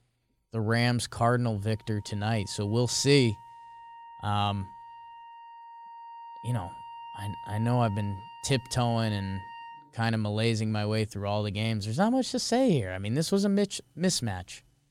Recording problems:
background music; noticeable; throughout; 15 dB below the speech

